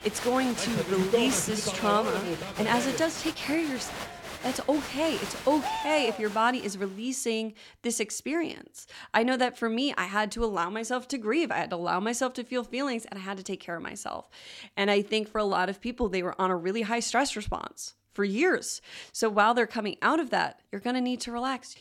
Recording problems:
crowd noise; loud; until 6.5 s; 5 dB below the speech

